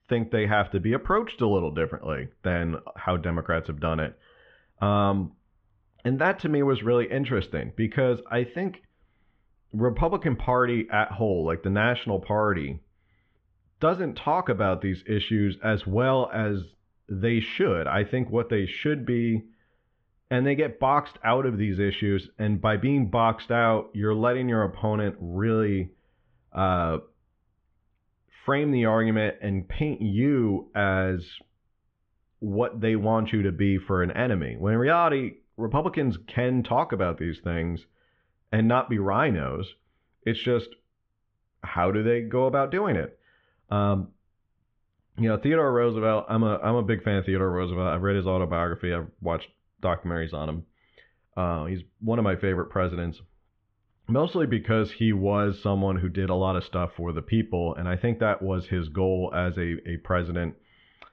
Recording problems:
muffled; very; fading above 3.5 kHz

